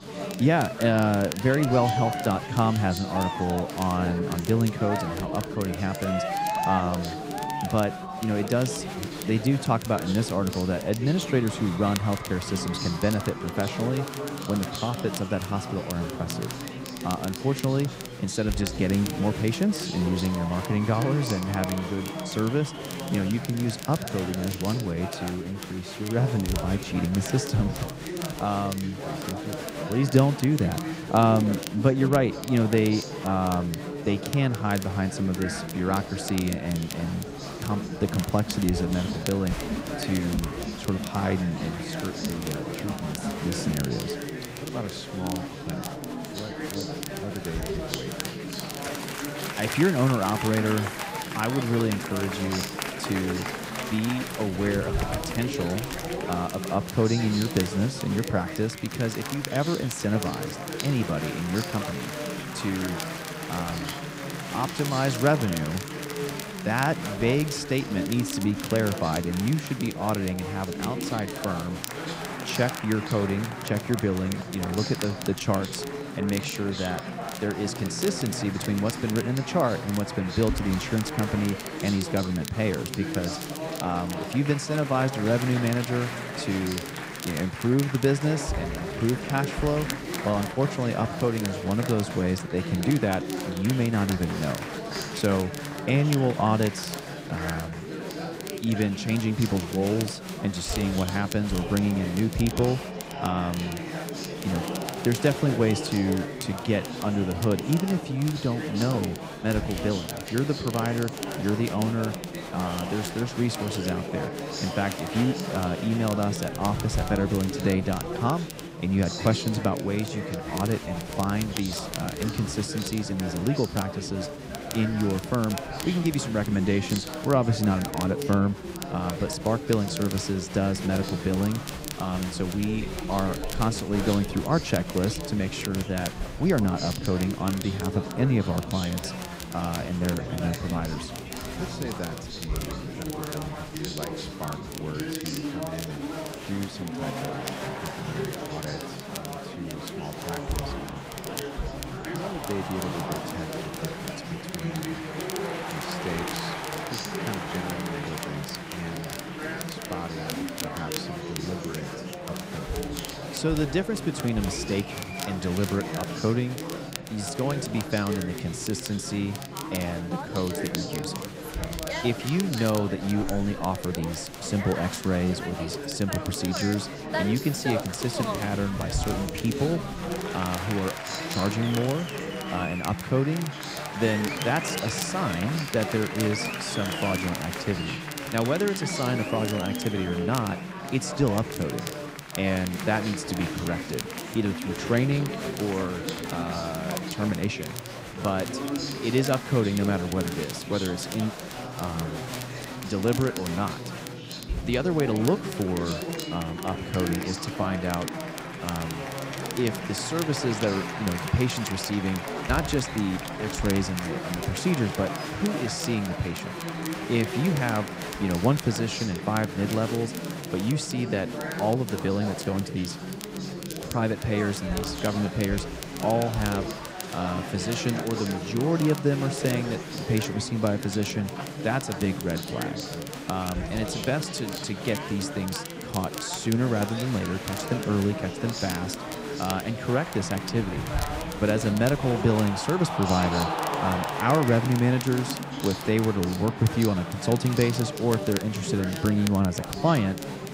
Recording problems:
chatter from many people; loud; throughout; 6 dB below the speech
crackle, like an old record; noticeable; 15 dB below the speech

